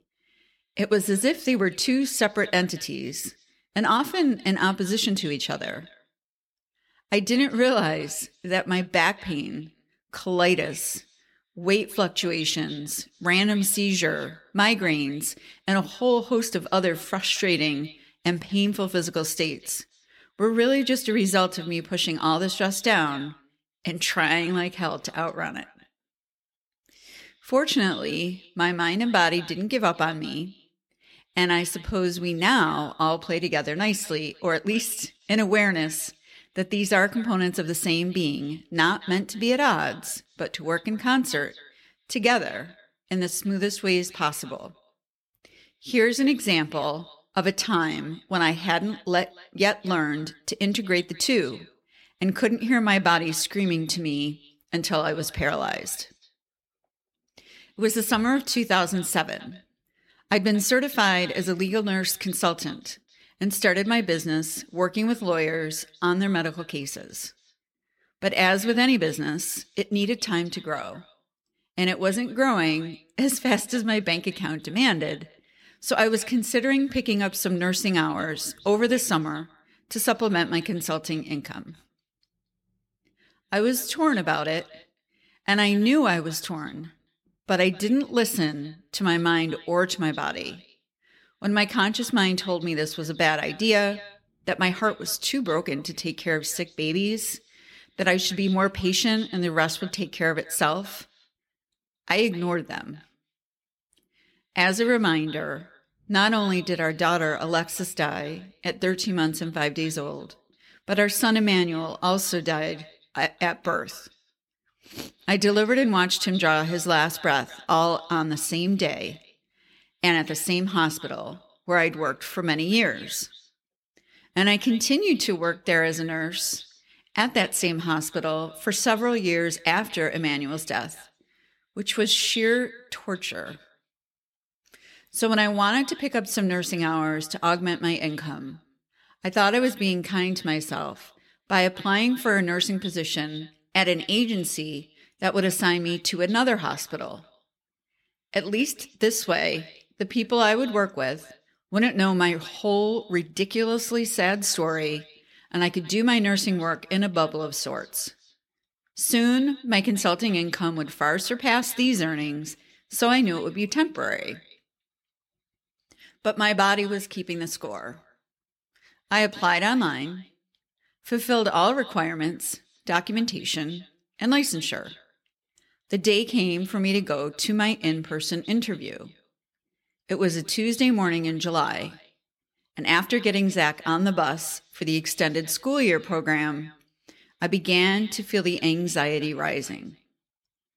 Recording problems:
echo of what is said; faint; throughout; 230 ms later, 25 dB below the speech

